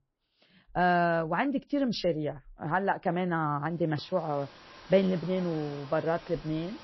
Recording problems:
garbled, watery; slightly; nothing above 5.5 kHz
animal sounds; noticeable; from 4 s on; 20 dB below the speech

